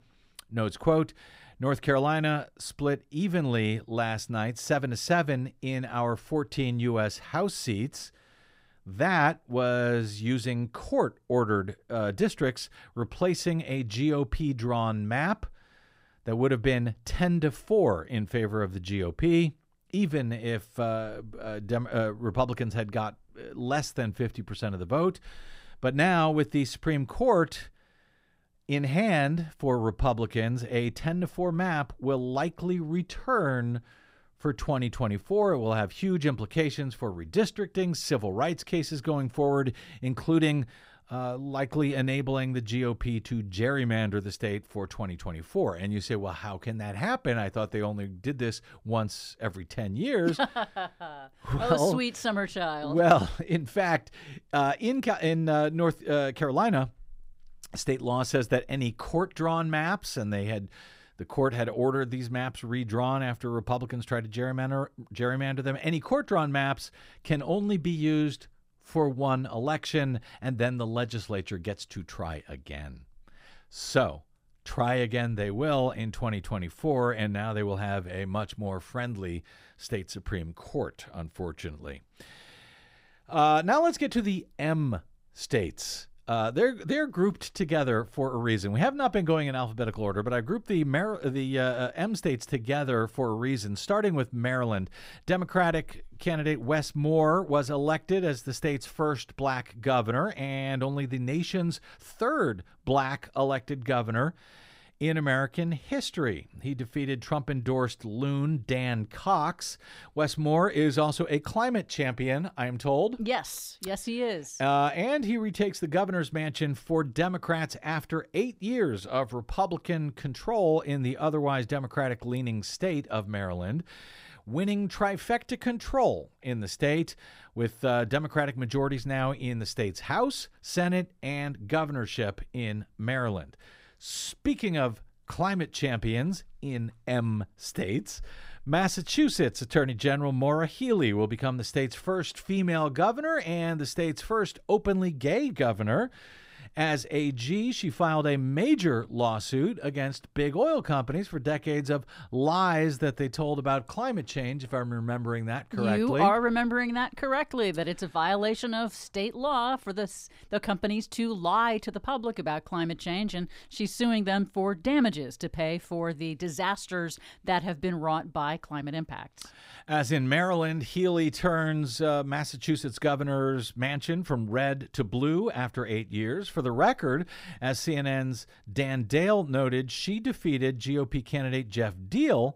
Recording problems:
none

